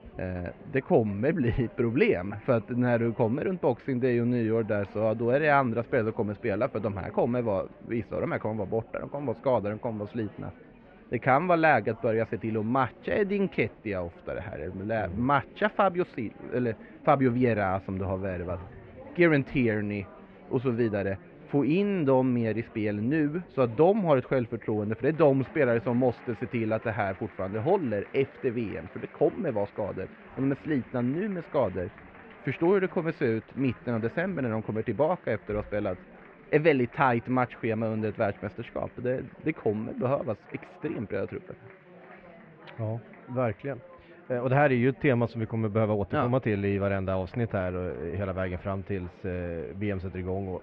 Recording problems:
muffled; very; fading above 2.5 kHz
chatter from many people; faint; throughout; 20 dB below the speech

